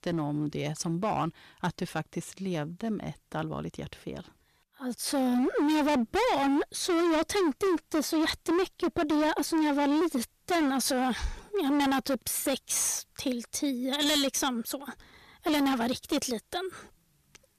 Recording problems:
distortion; heavy; 18% of the sound clipped

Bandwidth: 14.5 kHz